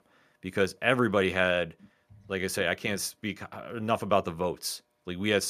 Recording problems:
abrupt cut into speech; at the end

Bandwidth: 14.5 kHz